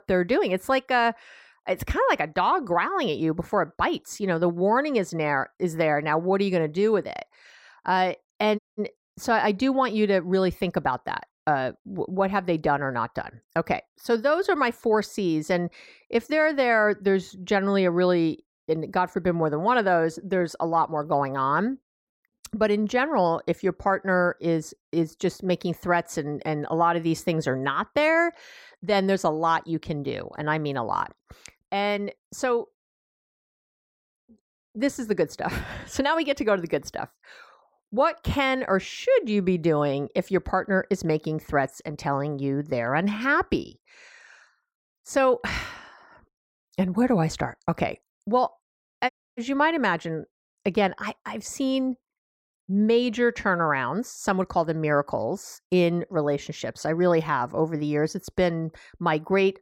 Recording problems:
audio cutting out; at 8.5 s and at 49 s

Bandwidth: 16 kHz